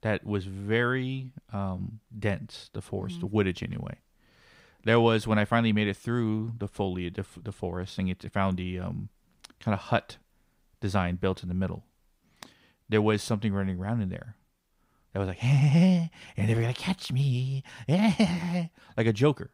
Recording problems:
none

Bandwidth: 15.5 kHz